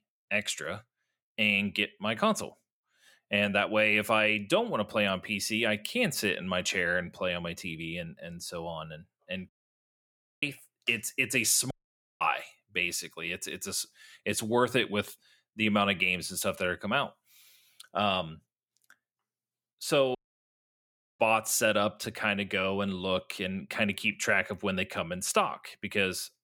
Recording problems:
audio cutting out; at 9.5 s for 1 s, at 12 s for 0.5 s and at 20 s for 1 s

